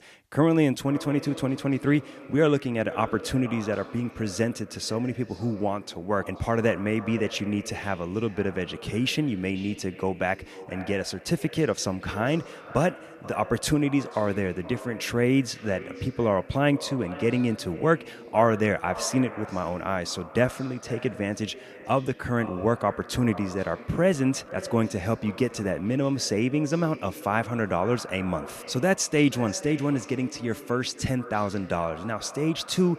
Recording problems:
echo of what is said; noticeable; throughout; 480 ms later, 15 dB below the speech

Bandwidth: 14.5 kHz